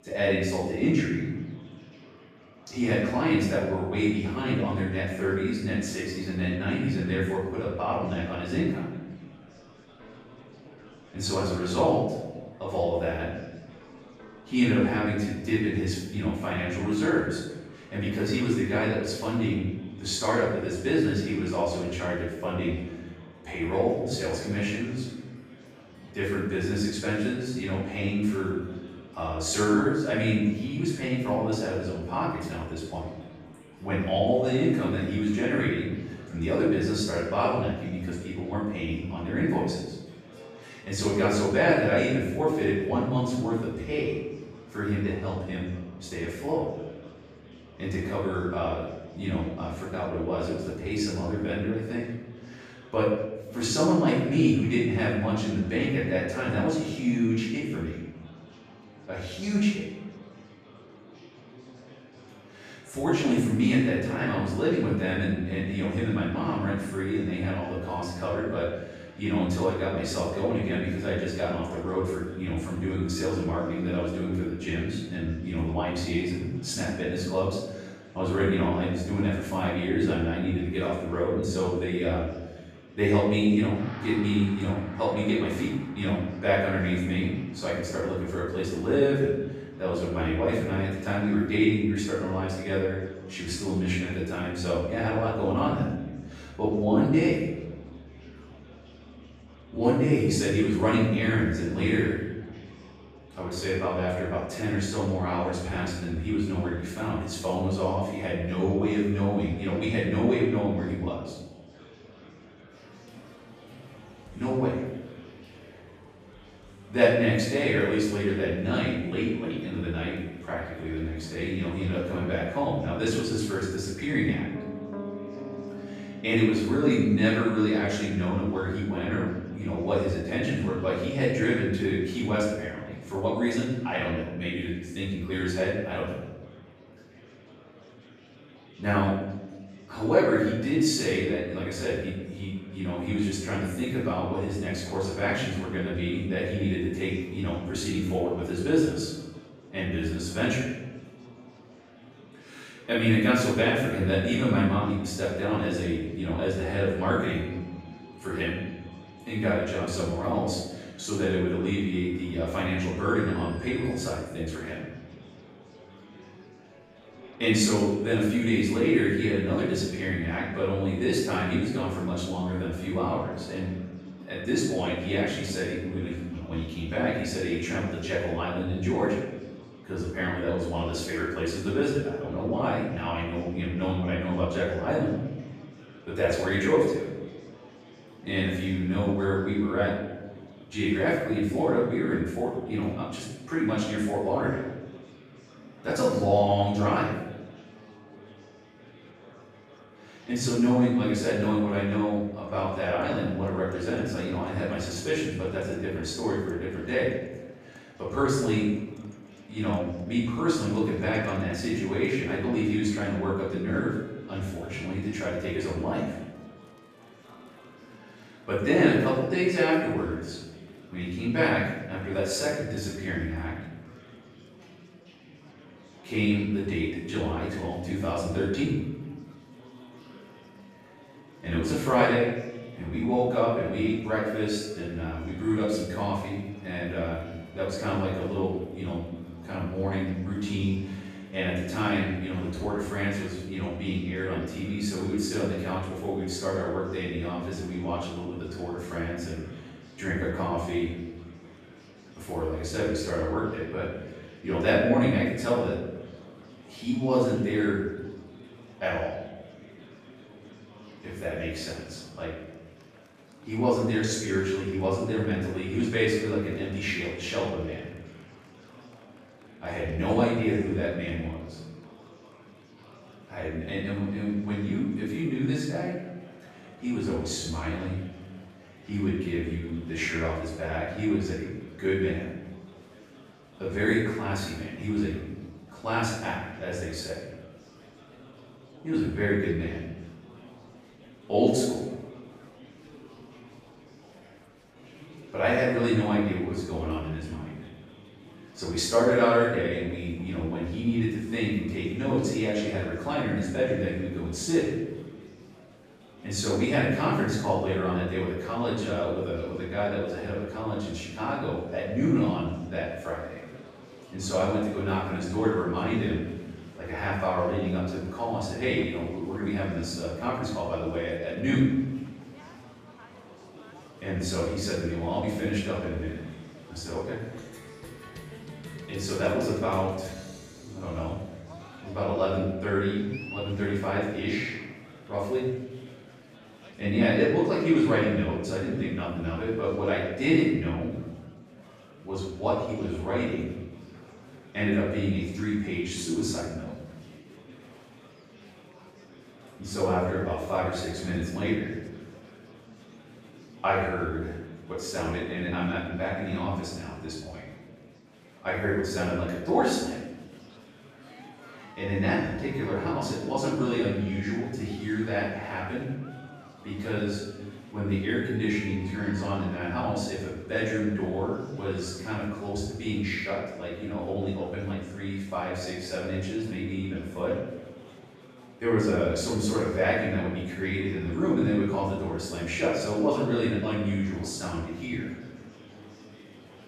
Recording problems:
off-mic speech; far
room echo; noticeable; dies away in 0.9 s
background music; faint; until 3:58; 25 dB below the speech
murmuring crowd; faint; throughout; 20 dB below the speech

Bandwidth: 14.5 kHz